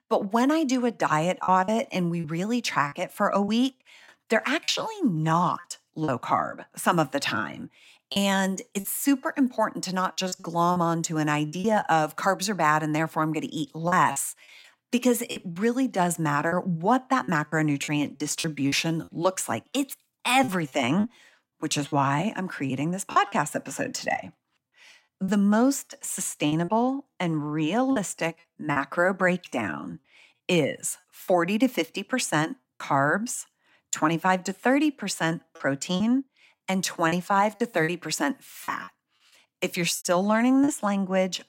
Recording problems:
choppy; very; 5% of the speech affected

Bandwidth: 16.5 kHz